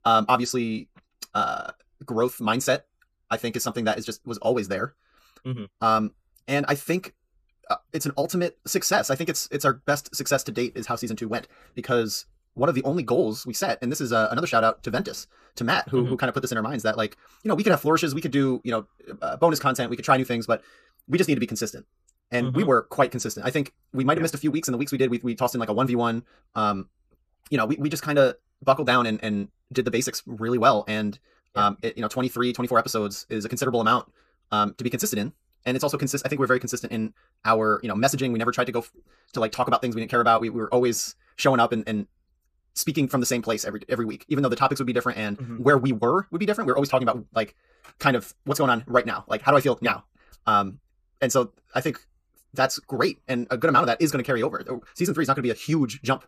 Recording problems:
wrong speed, natural pitch; too fast; 1.7 times normal speed

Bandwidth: 14.5 kHz